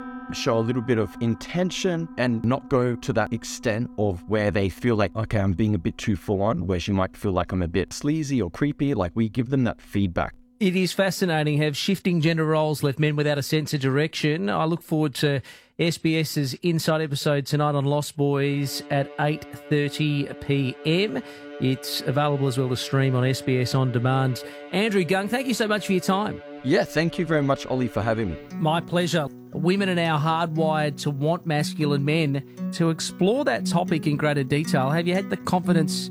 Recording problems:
background music; noticeable; throughout; 15 dB below the speech

